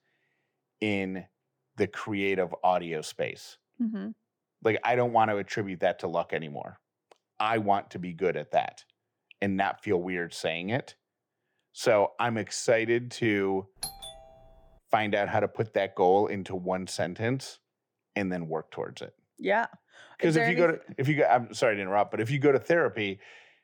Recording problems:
muffled; slightly; fading above 2 kHz
doorbell; noticeable; at 14 s; peak 9 dB below the speech

